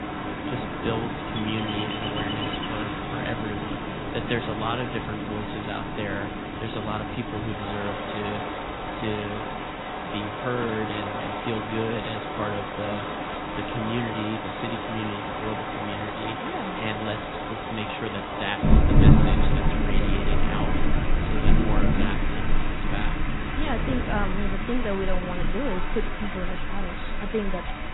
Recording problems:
garbled, watery; badly; nothing above 4 kHz
rain or running water; very loud; throughout; 4 dB above the speech
wind noise on the microphone; occasional gusts; 15 dB below the speech

